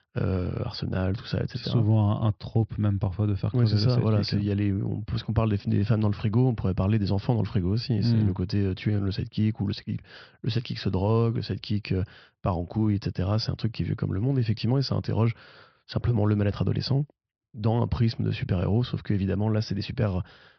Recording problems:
high frequencies cut off; noticeable; nothing above 5.5 kHz

